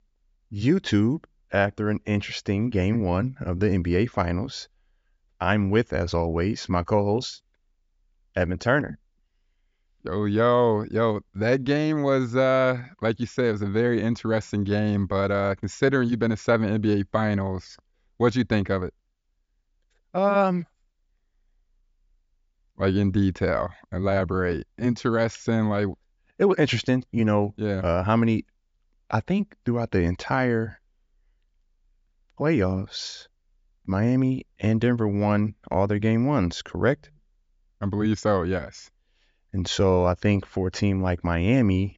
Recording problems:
high frequencies cut off; noticeable; nothing above 7.5 kHz

